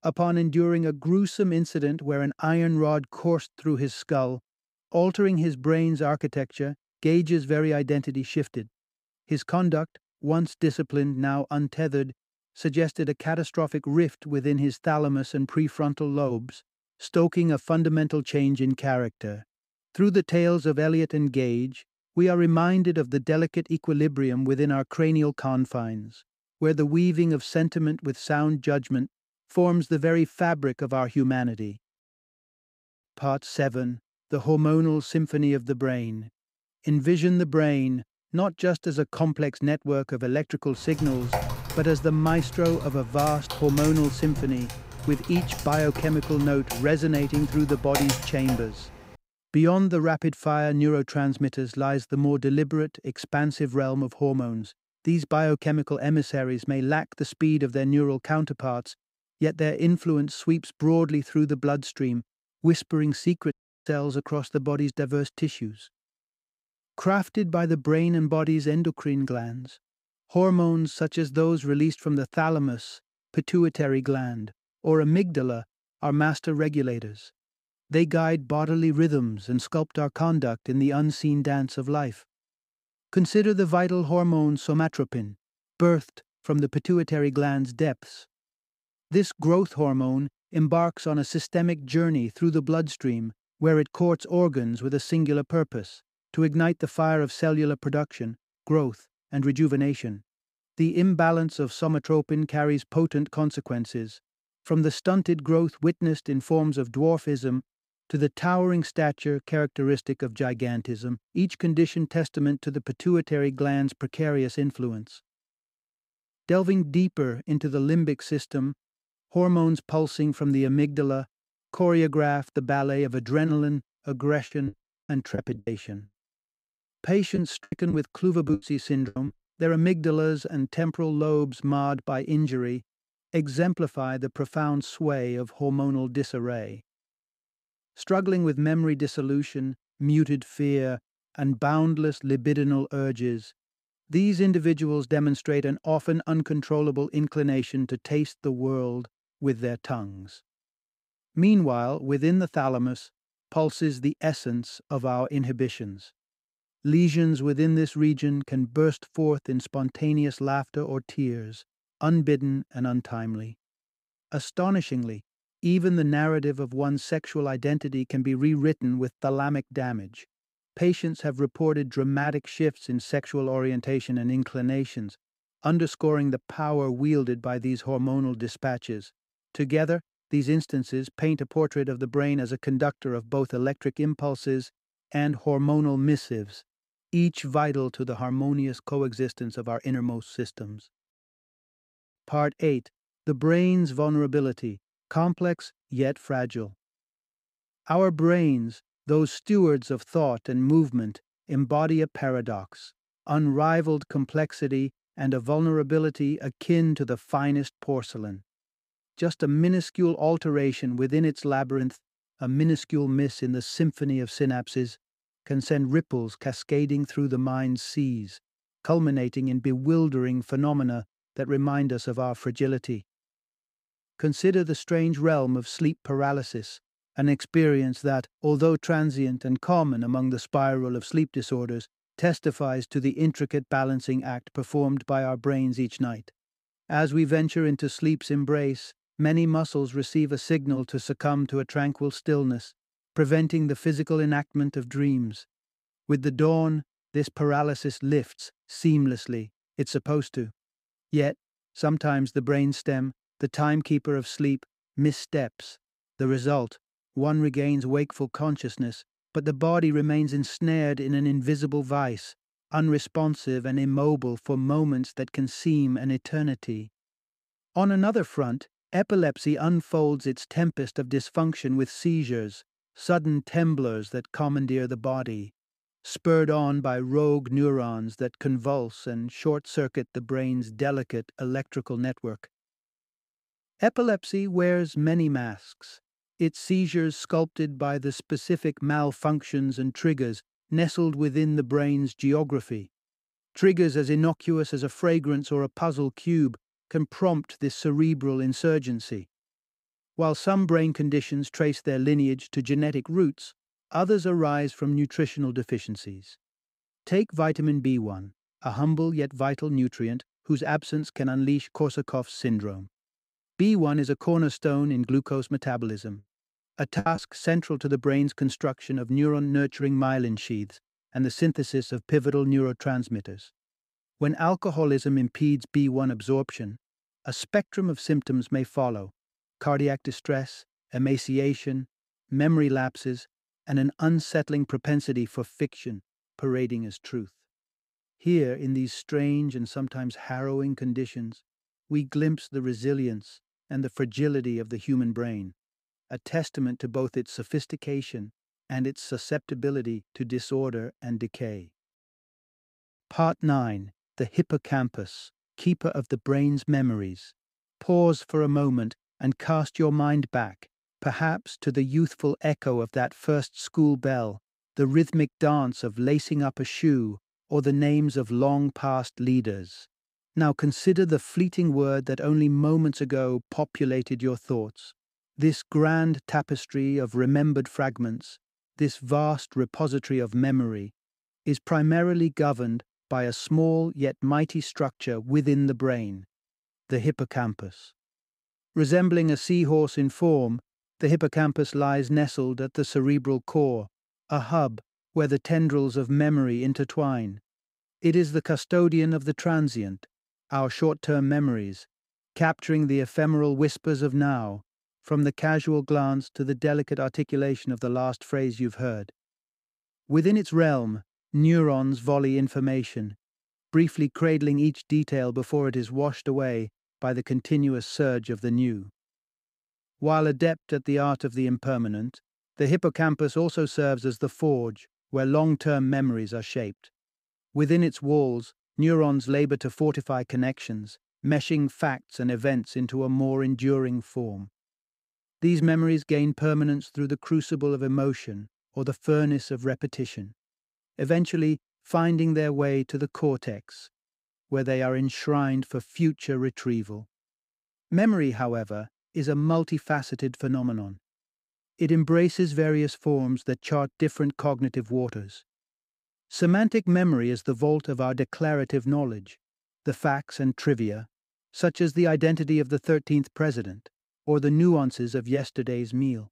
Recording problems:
keyboard typing; noticeable; from 41 to 49 s; peak 1 dB below the speech
audio cutting out; at 1:04
choppy; very; from 2:04 to 2:09 and at 5:17; 15% of the speech affected

